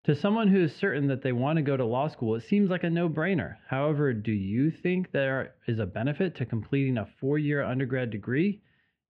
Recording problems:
muffled; very; fading above 2.5 kHz

